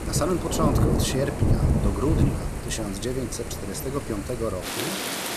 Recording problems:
rain or running water; very loud; throughout; 3 dB above the speech

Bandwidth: 14.5 kHz